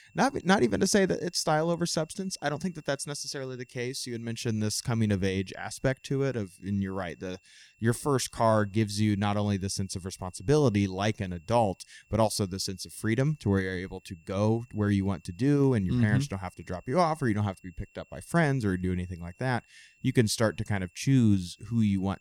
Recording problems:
high-pitched whine; faint; throughout; 2.5 kHz, 35 dB below the speech

